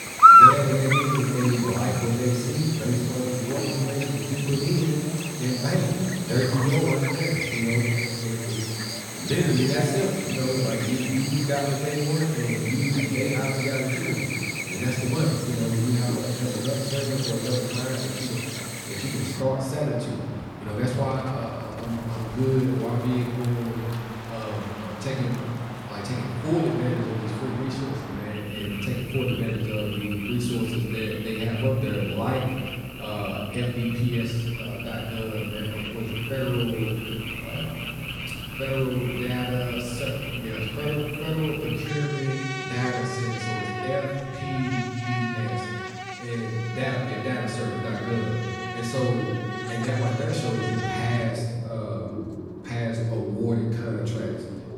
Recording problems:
off-mic speech; far
room echo; noticeable; dies away in 1.5 s
animal sounds; loud; throughout; 1 dB below the speech

